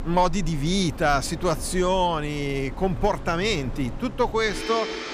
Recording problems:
household noises; noticeable; throughout; 10 dB below the speech

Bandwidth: 14.5 kHz